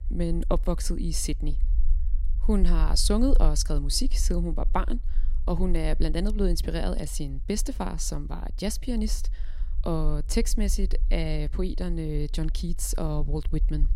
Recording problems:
low rumble; faint; throughout; 25 dB below the speech

